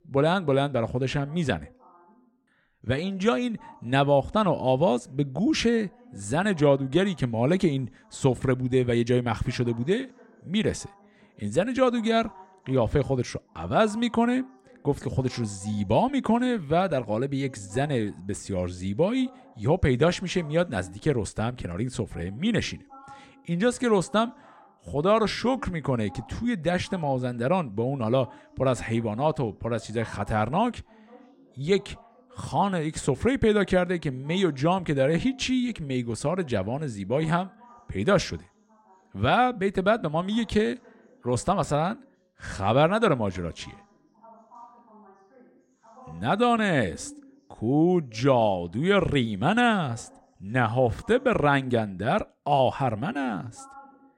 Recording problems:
voice in the background; faint; throughout; 25 dB below the speech

